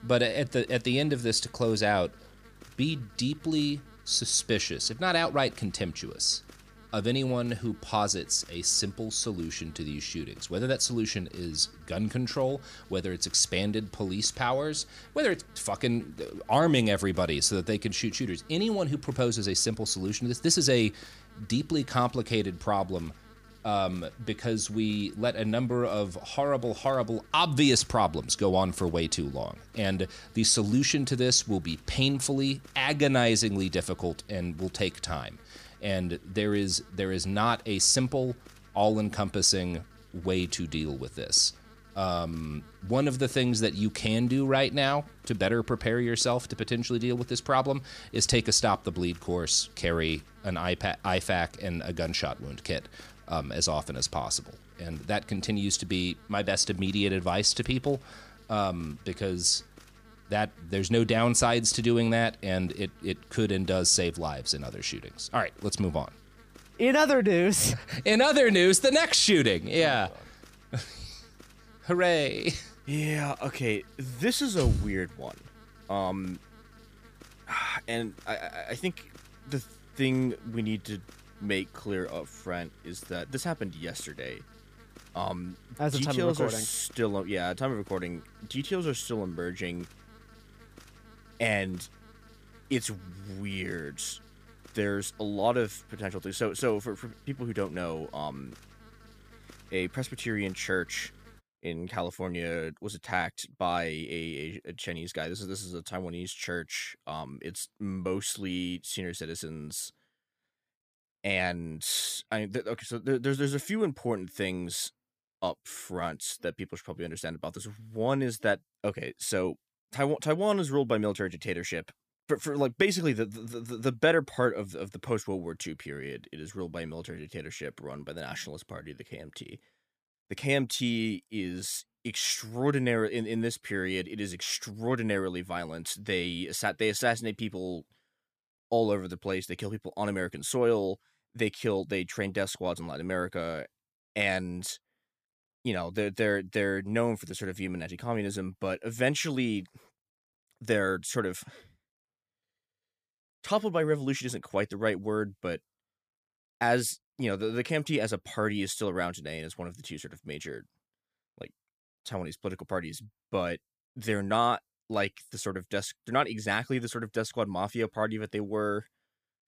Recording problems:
electrical hum; faint; until 1:41; 50 Hz, 25 dB below the speech

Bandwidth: 15 kHz